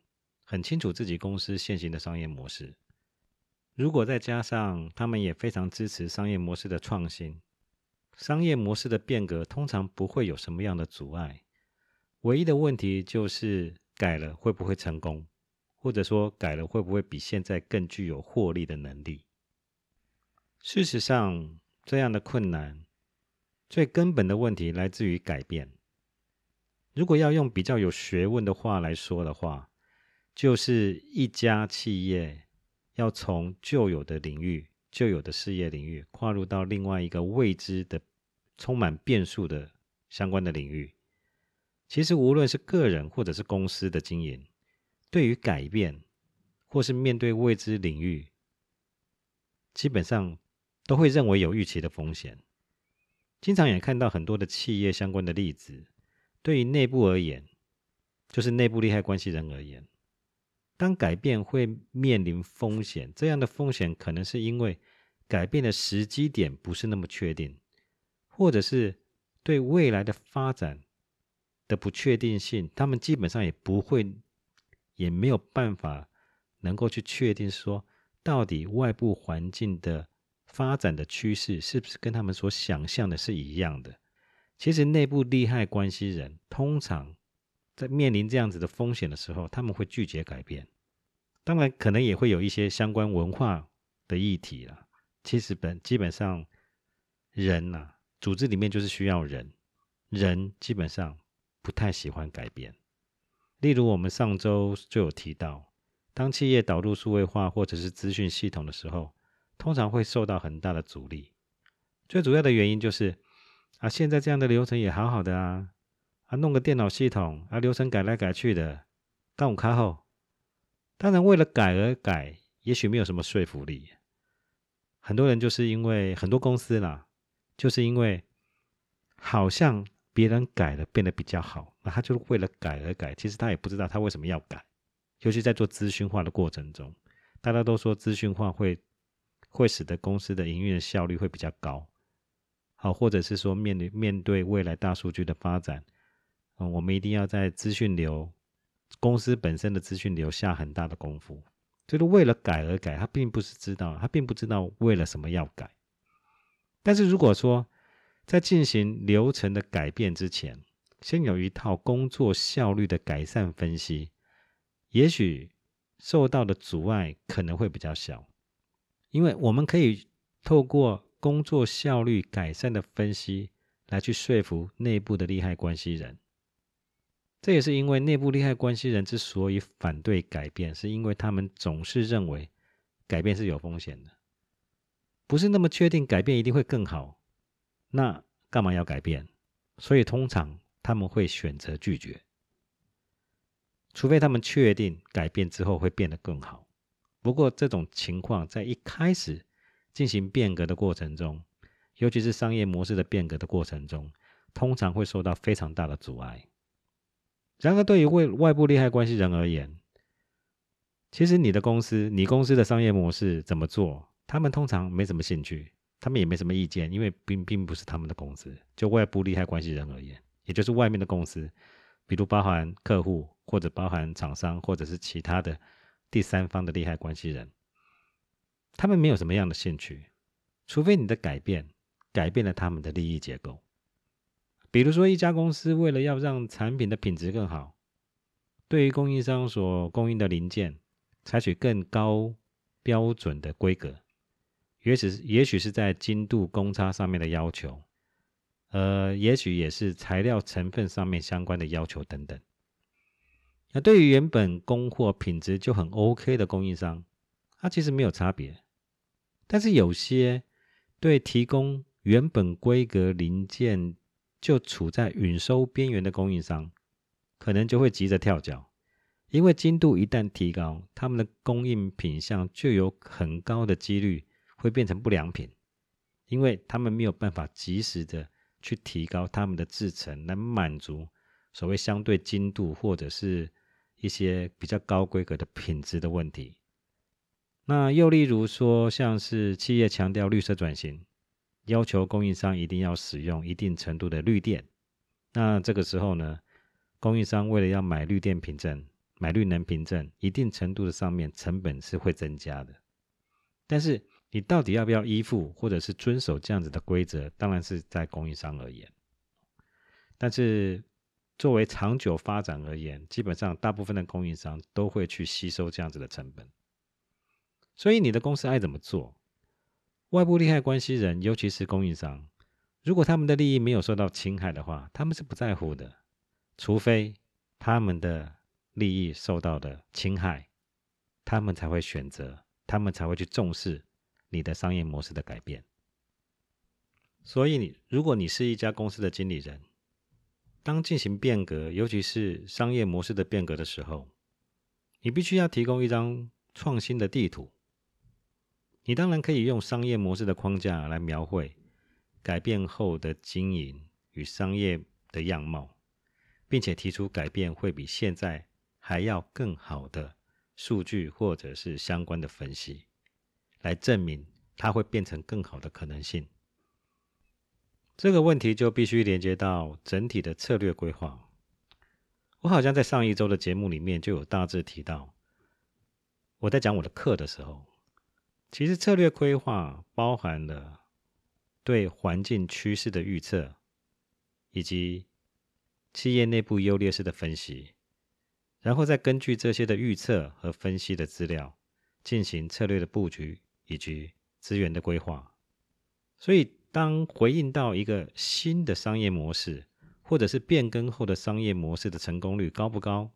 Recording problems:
none

